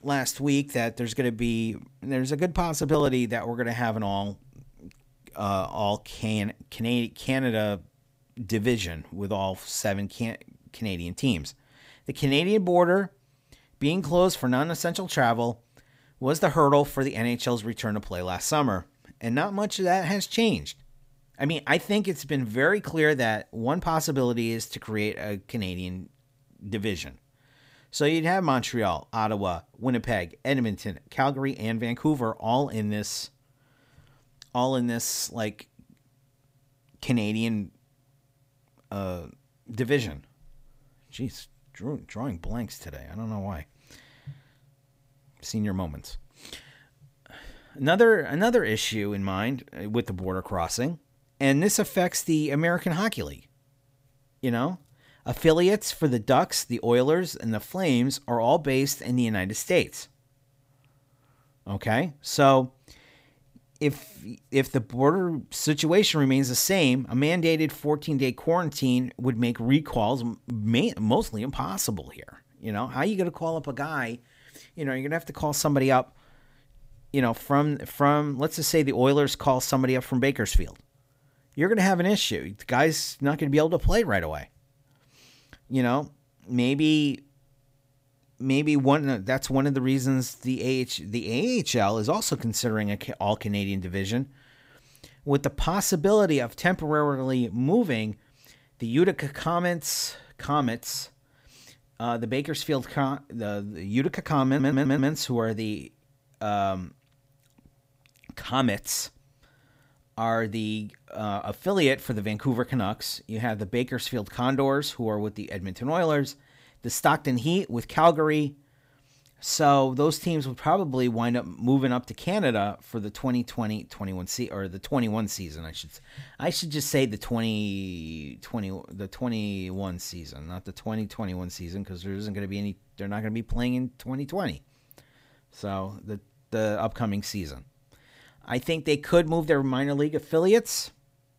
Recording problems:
audio stuttering; at 1:44

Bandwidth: 15.5 kHz